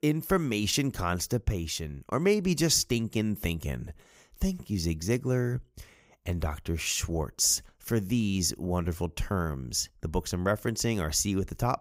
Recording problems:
none

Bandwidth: 15.5 kHz